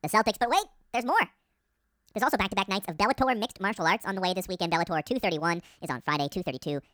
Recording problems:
wrong speed and pitch; too fast and too high; 1.6 times normal speed

